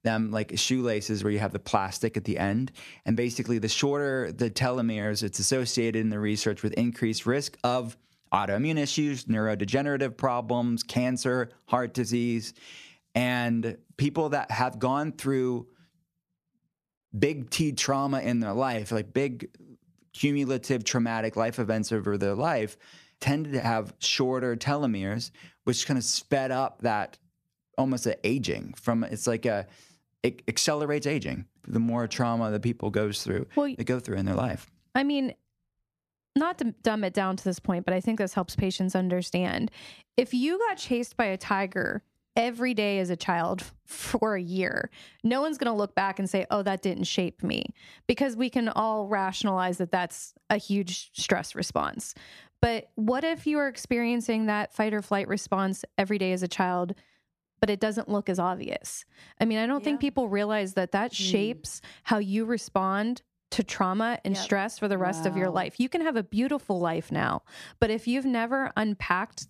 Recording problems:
squashed, flat; somewhat

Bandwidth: 14.5 kHz